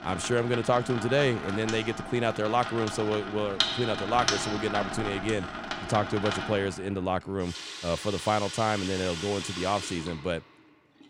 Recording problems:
household noises; loud; throughout; 5 dB below the speech

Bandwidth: 16 kHz